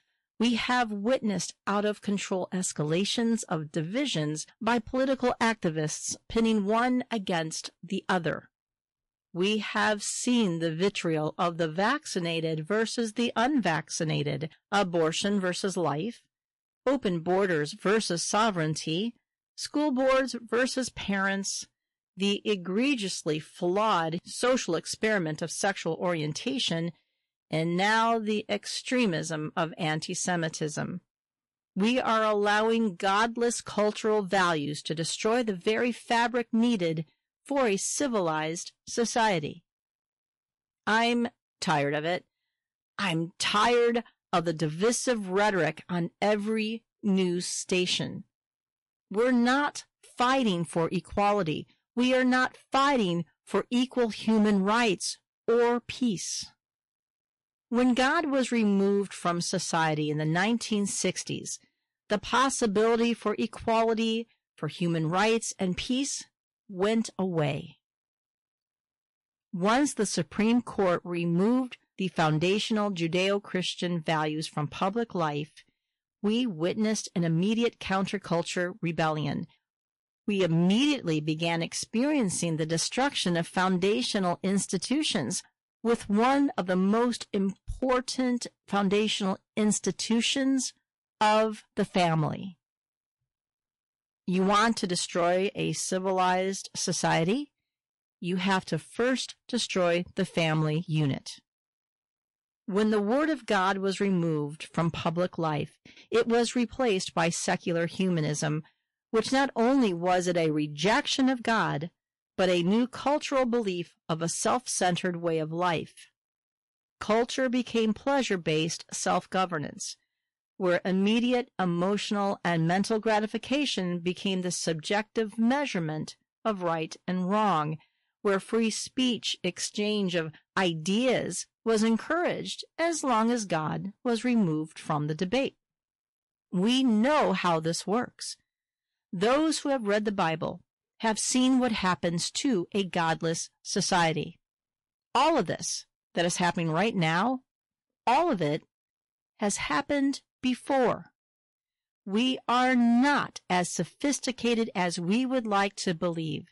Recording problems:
distortion; slight; 6% of the sound clipped
garbled, watery; slightly; nothing above 11 kHz

